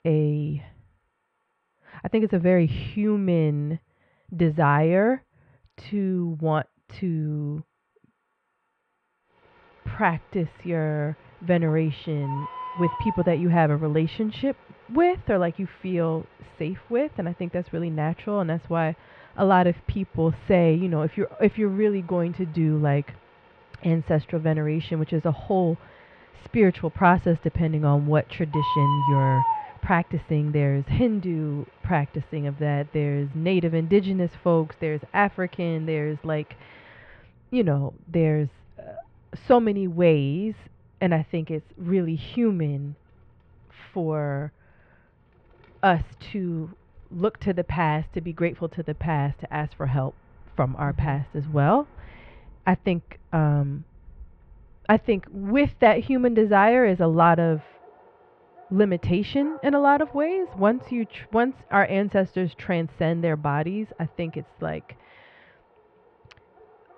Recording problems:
muffled; very; fading above 3 kHz
animal sounds; loud; throughout; 10 dB below the speech

